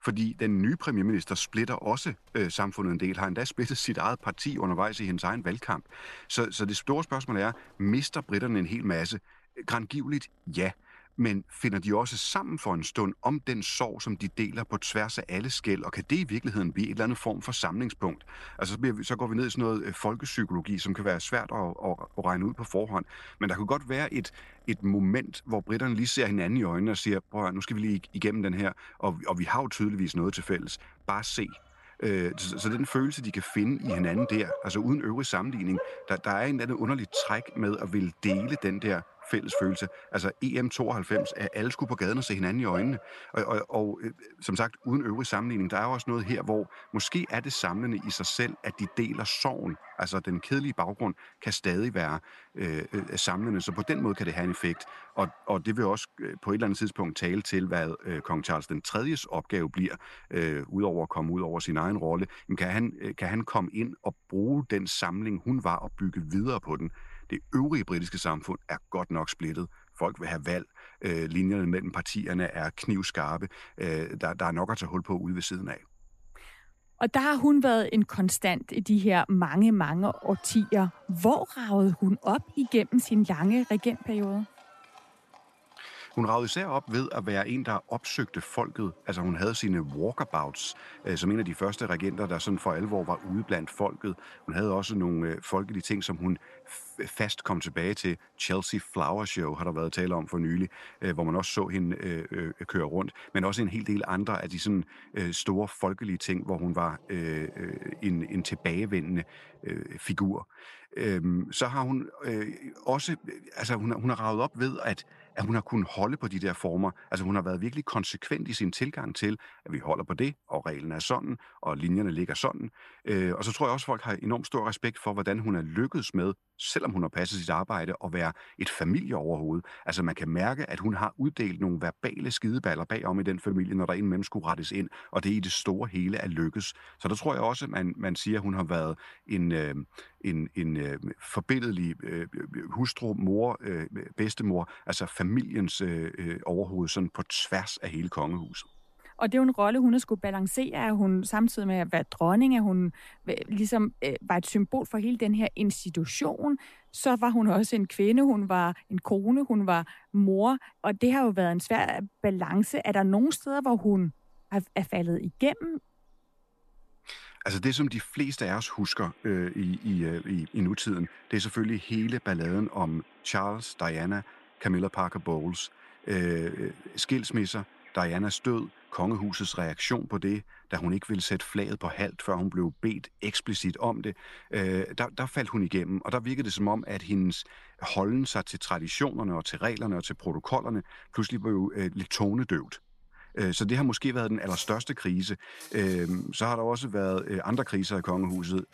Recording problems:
animal sounds; noticeable; throughout; 20 dB below the speech

